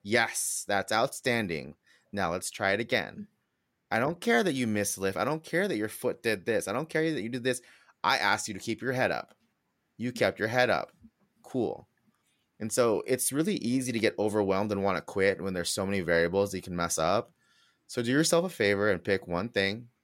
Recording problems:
none

